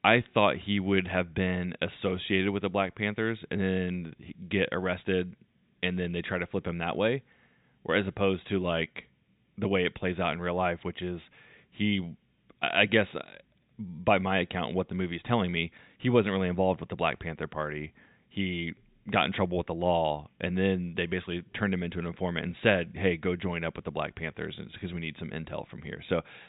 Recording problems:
high frequencies cut off; severe; nothing above 4 kHz

